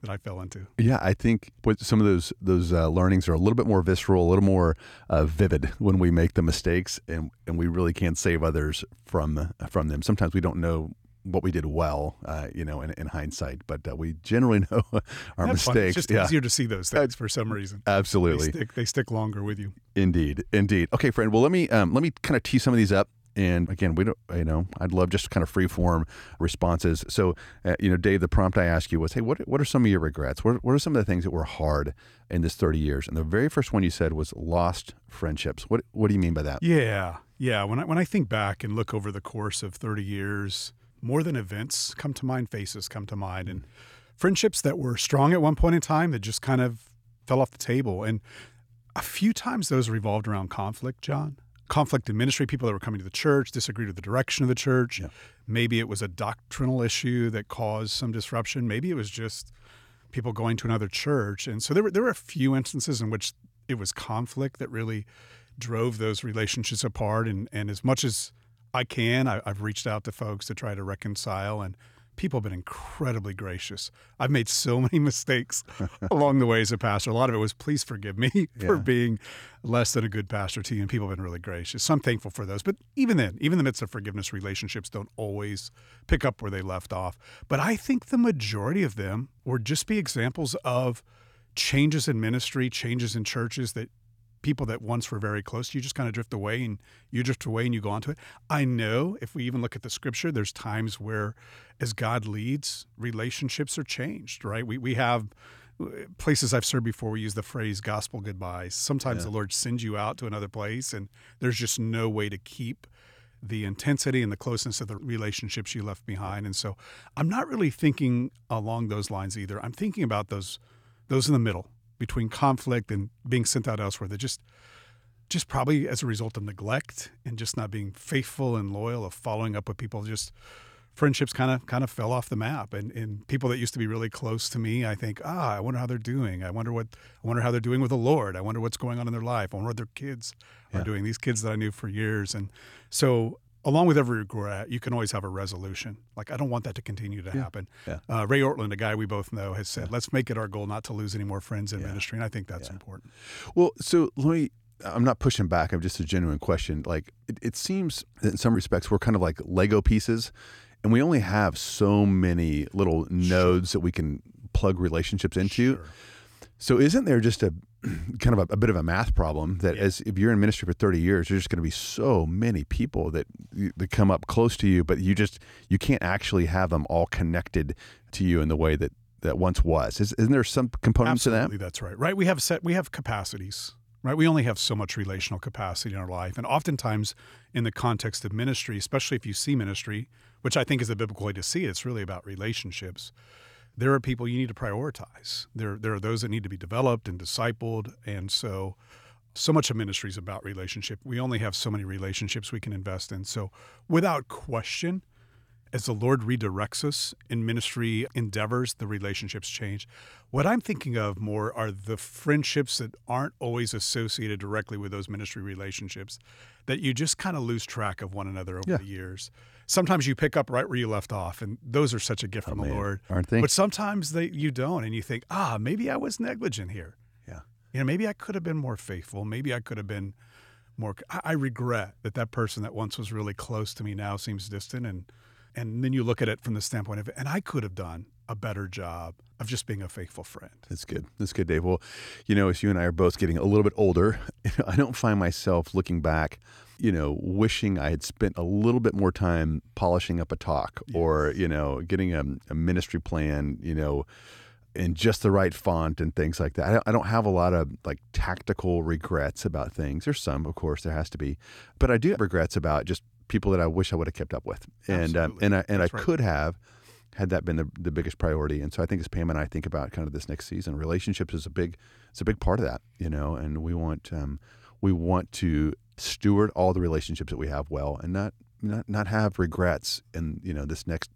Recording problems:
none

